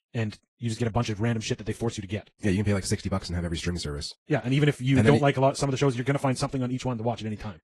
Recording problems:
wrong speed, natural pitch; too fast; 1.5 times normal speed
garbled, watery; slightly

